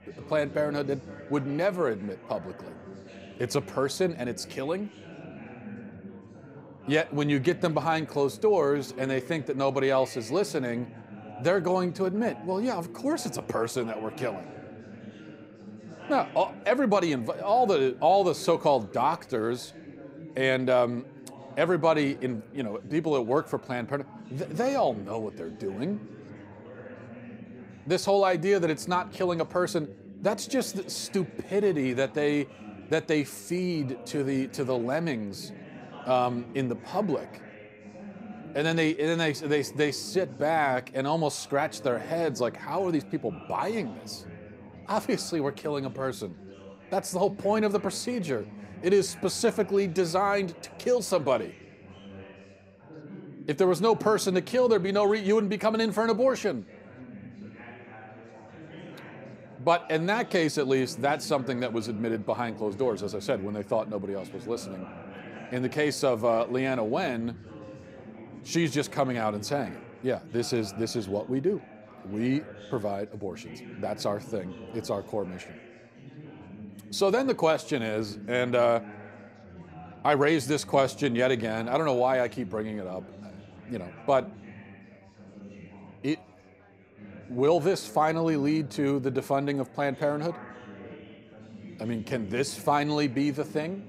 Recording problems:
chatter from many people; noticeable; throughout; 15 dB below the speech

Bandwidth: 15.5 kHz